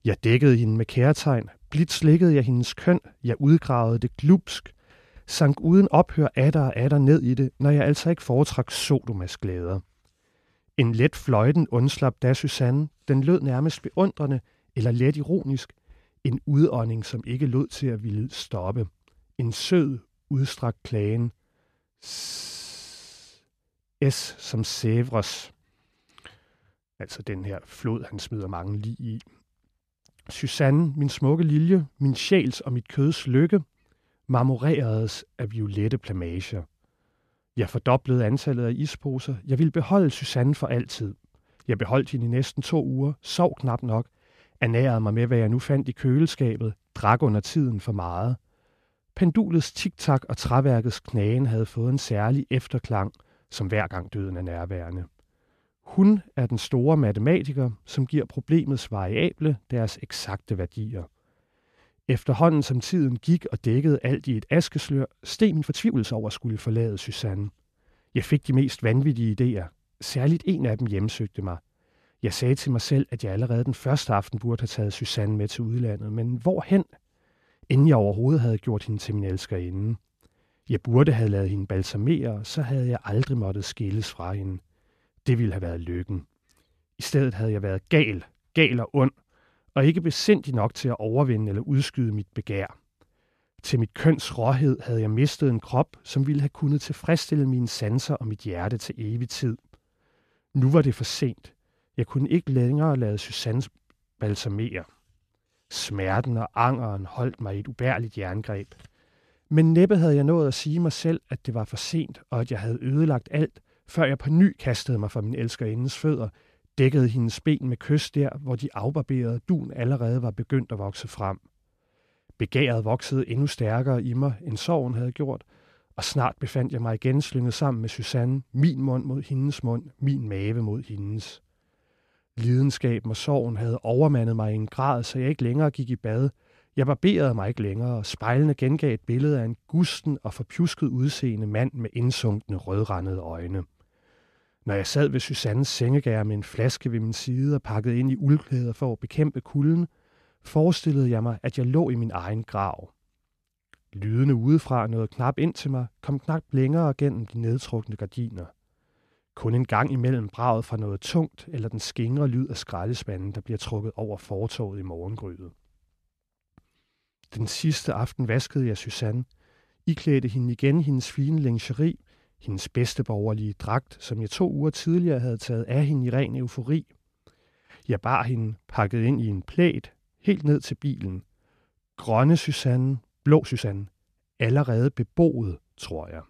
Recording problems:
uneven, jittery; strongly; from 3.5 s to 3:04

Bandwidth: 14 kHz